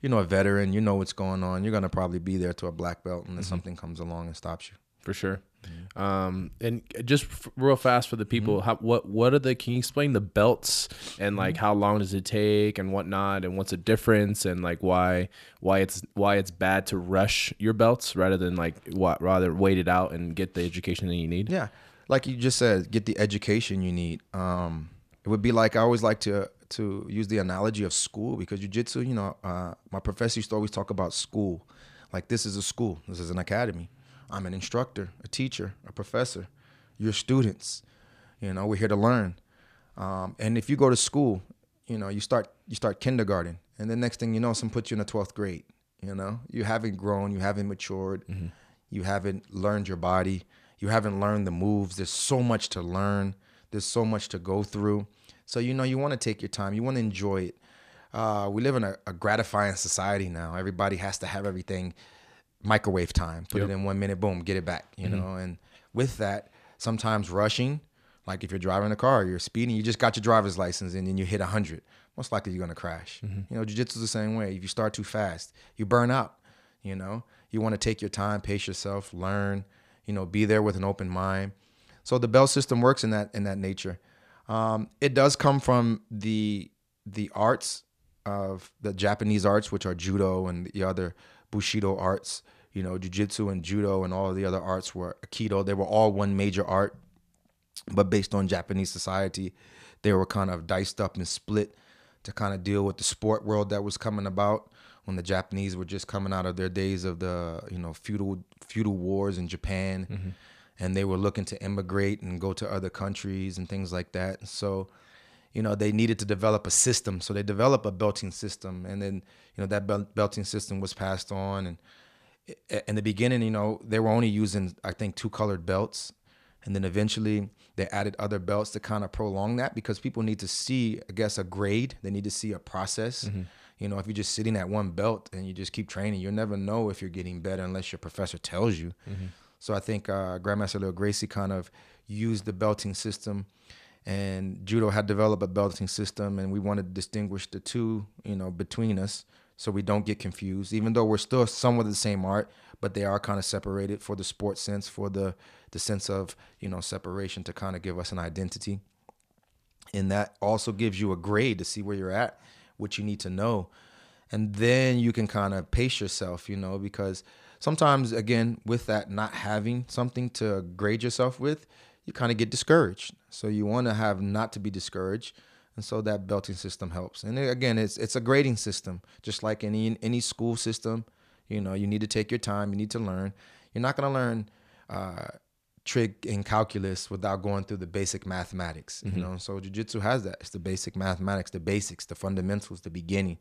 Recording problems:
none

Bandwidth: 14.5 kHz